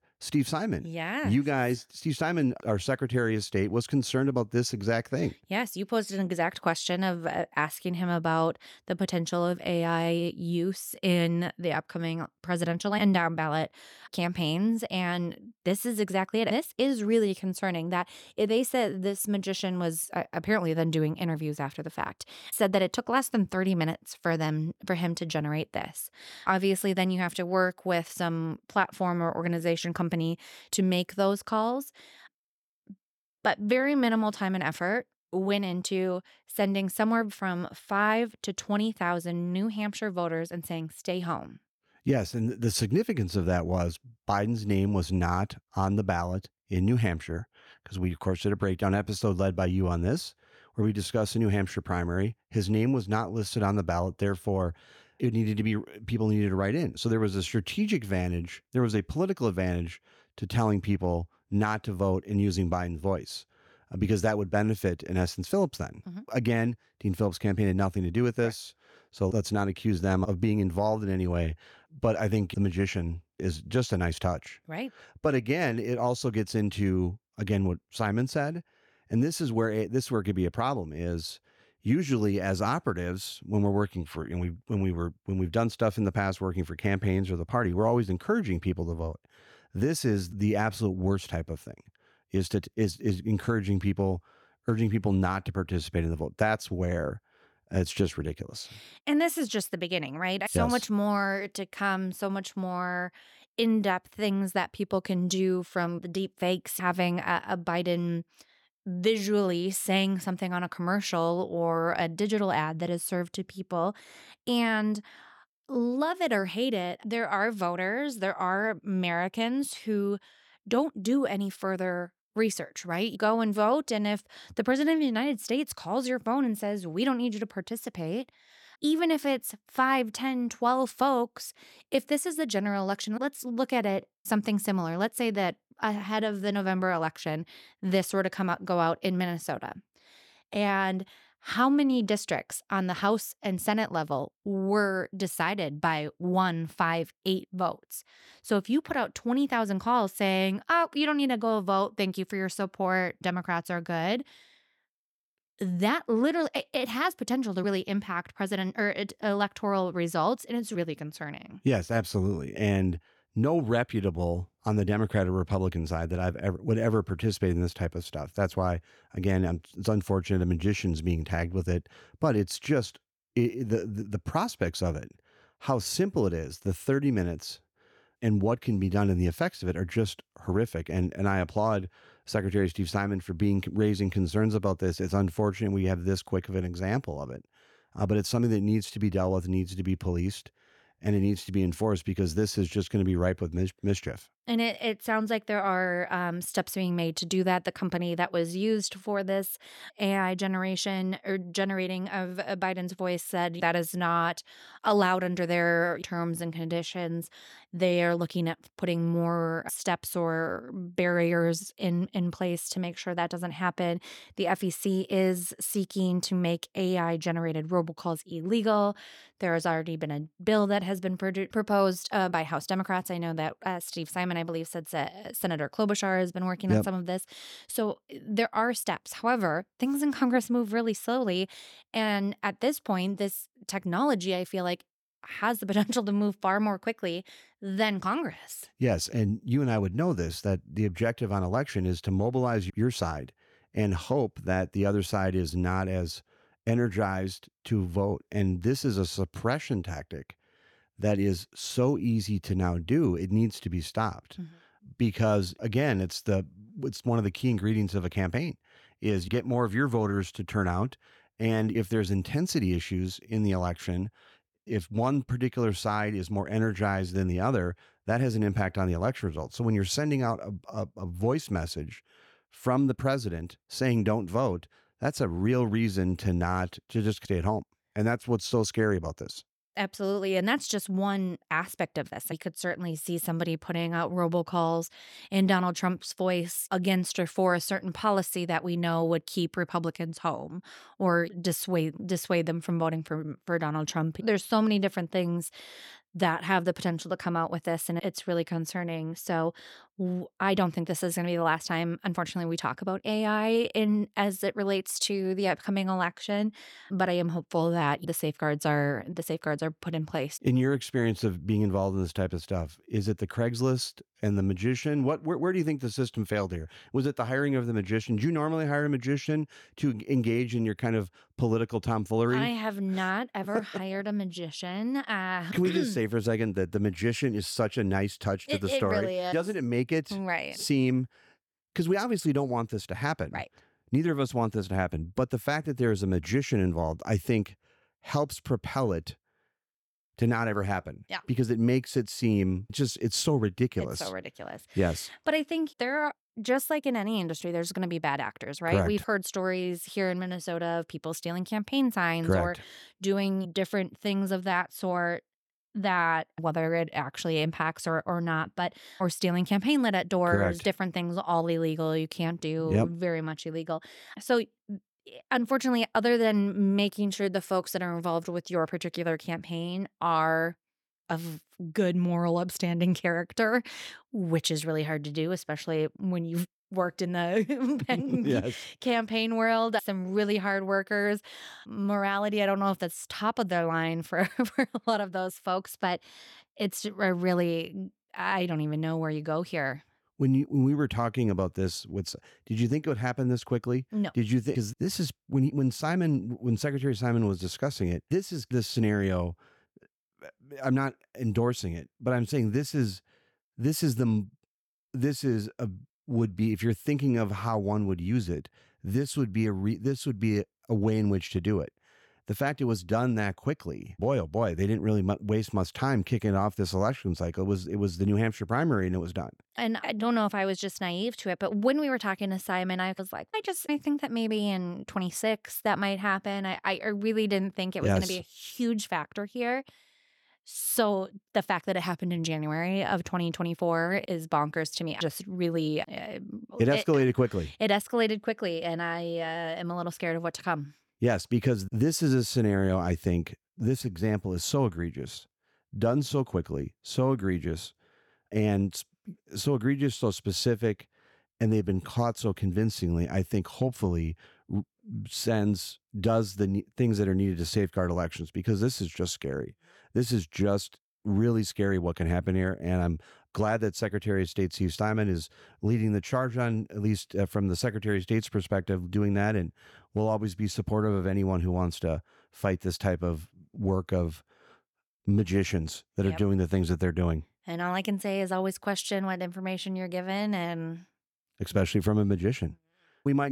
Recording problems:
abrupt cut into speech; at the end

